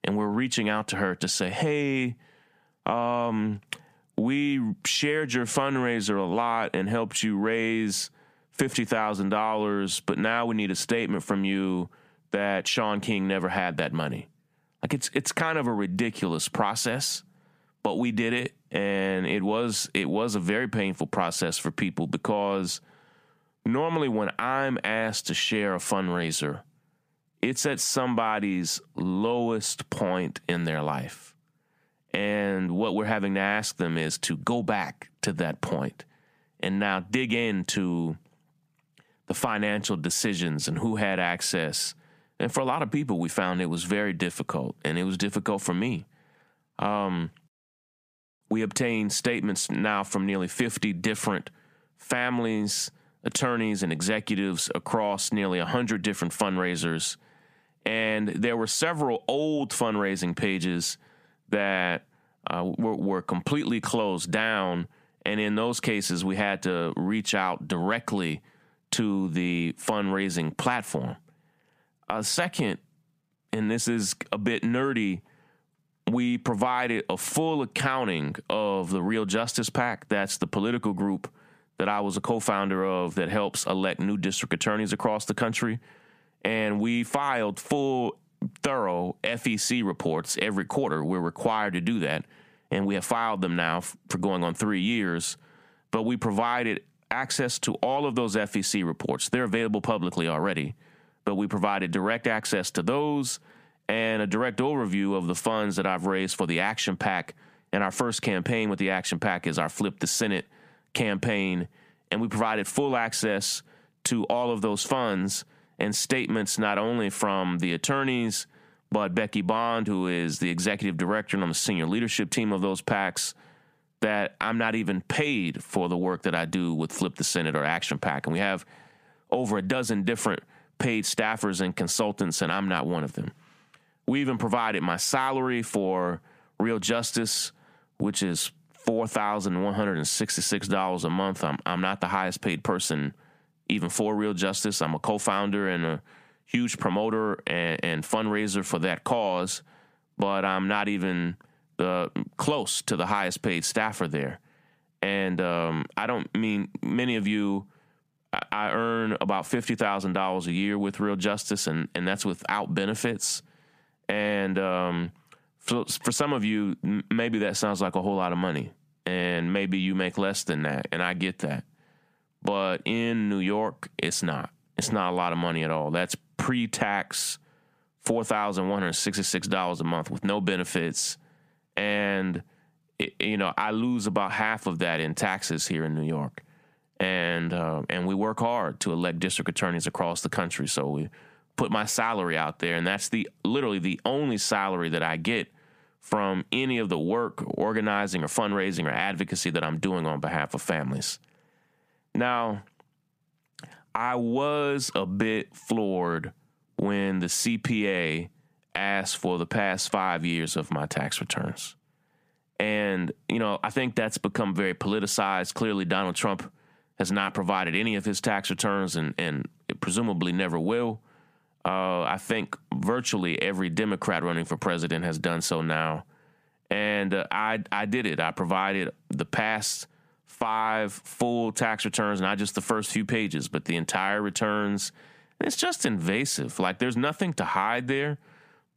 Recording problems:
squashed, flat; heavily

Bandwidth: 15 kHz